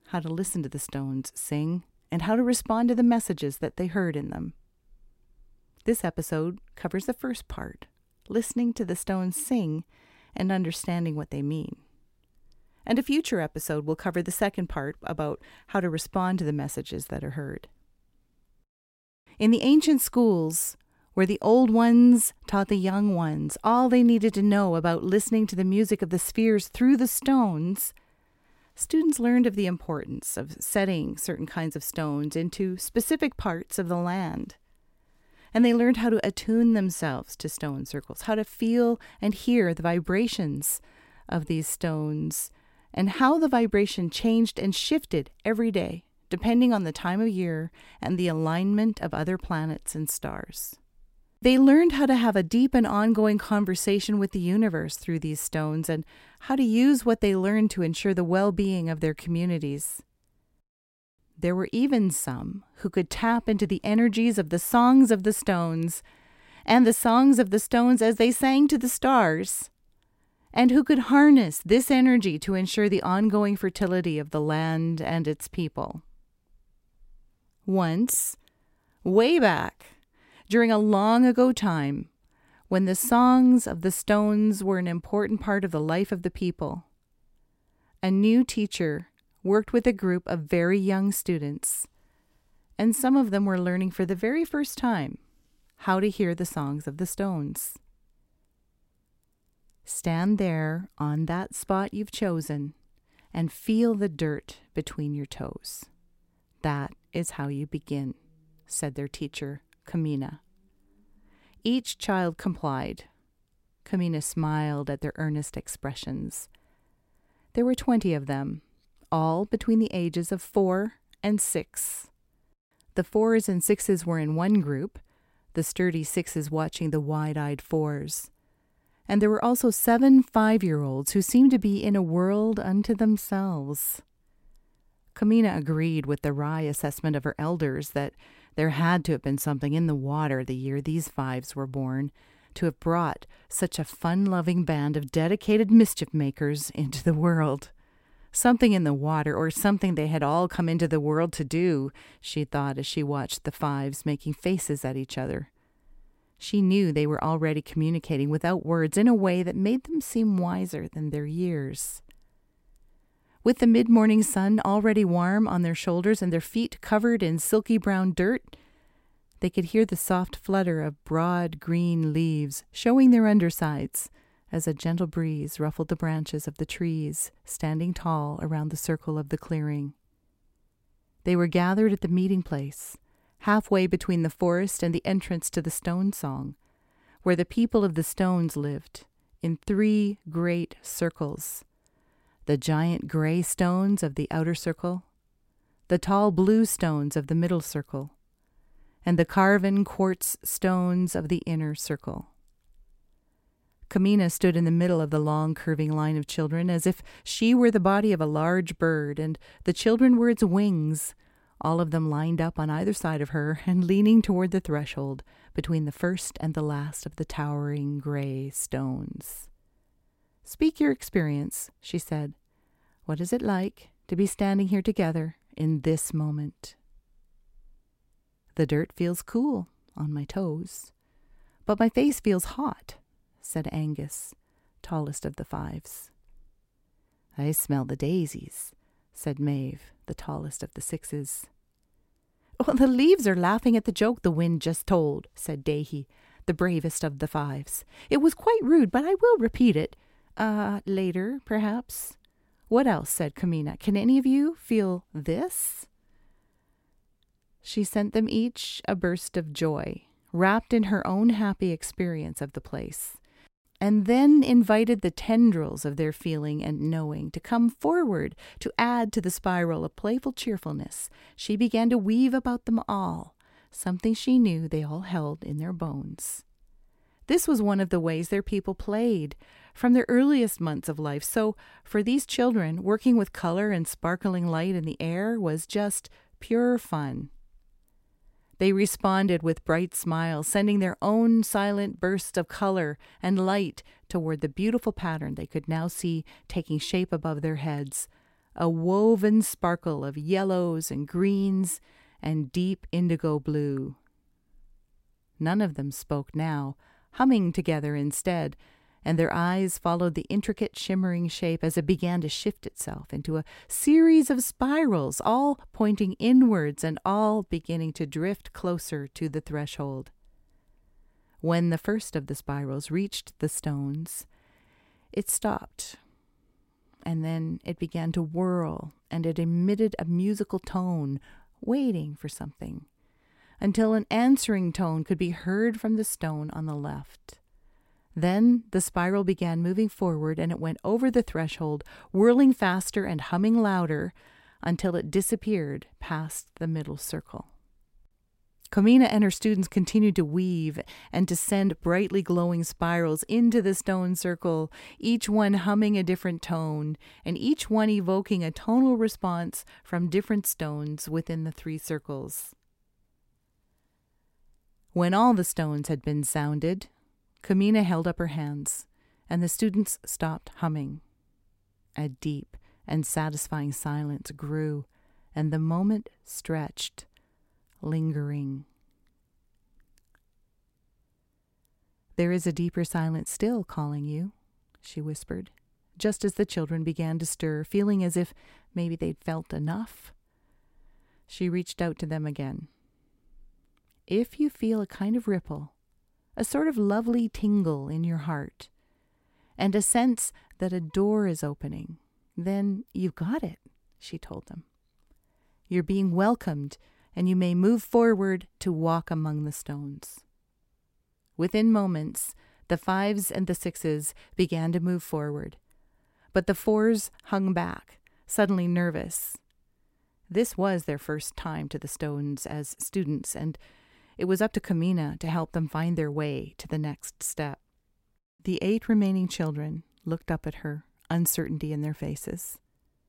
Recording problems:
none

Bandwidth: 16 kHz